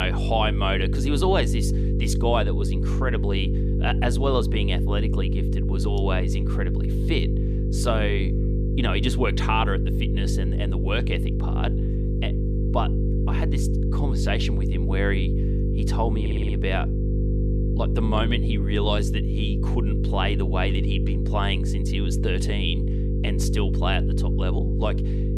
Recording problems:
electrical hum; loud; throughout; 50 Hz, 6 dB below the speech
abrupt cut into speech; at the start
audio stuttering; at 16 s

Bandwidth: 15 kHz